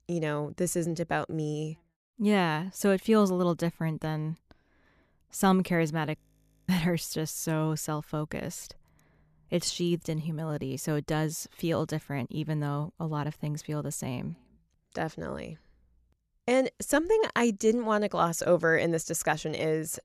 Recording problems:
audio freezing; at 6 s for 0.5 s

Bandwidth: 14 kHz